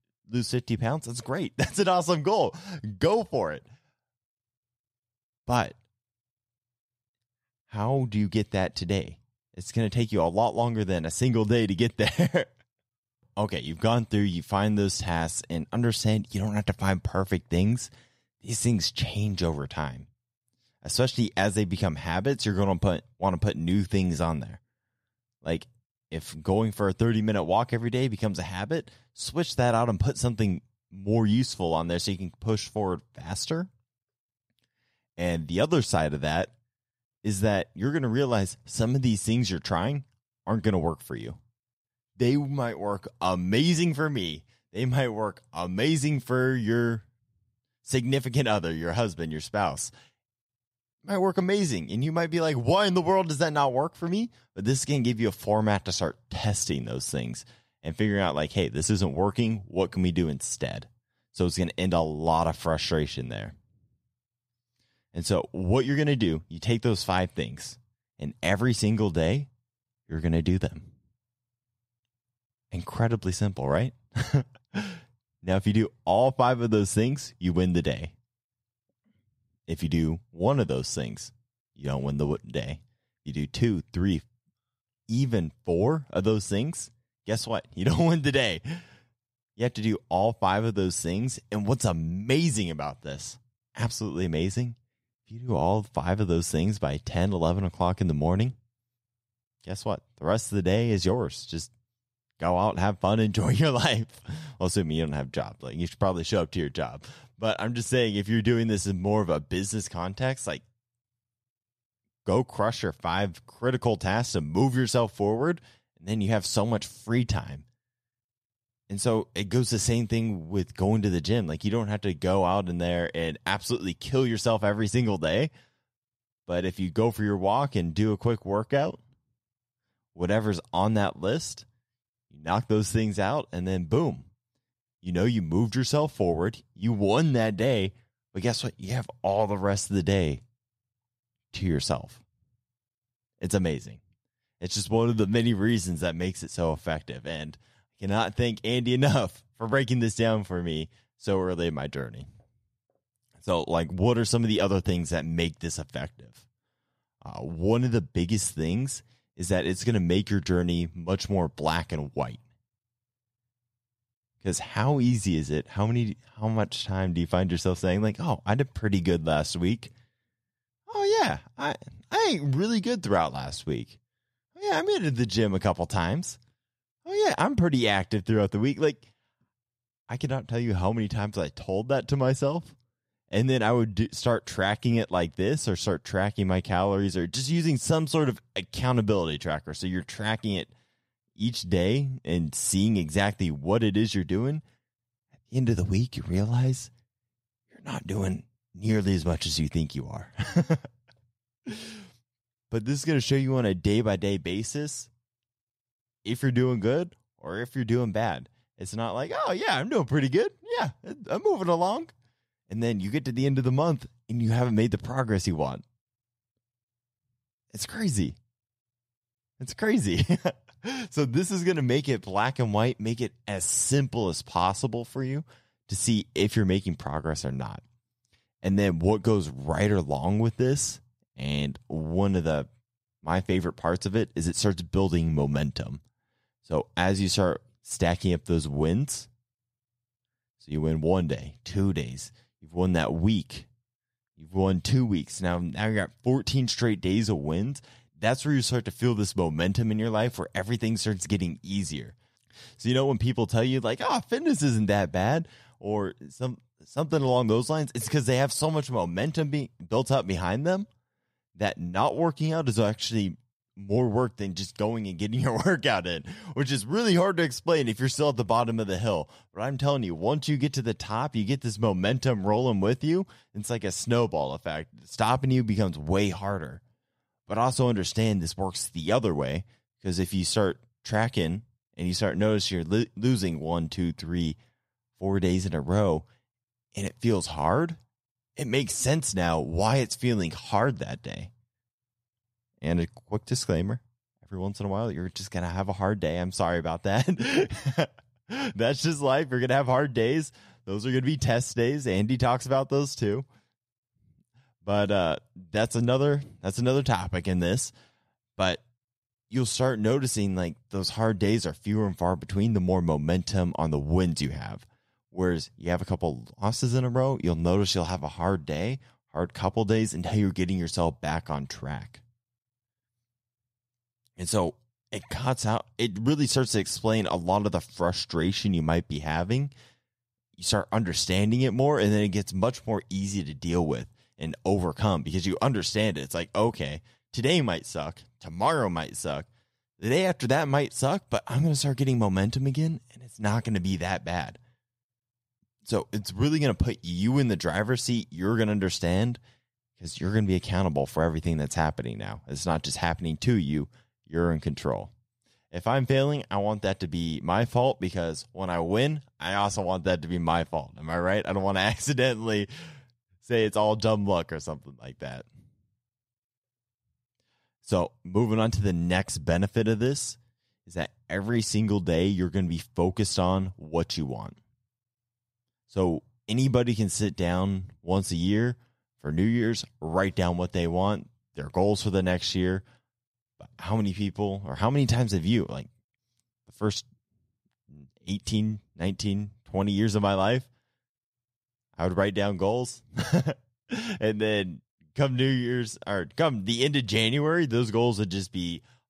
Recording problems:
none

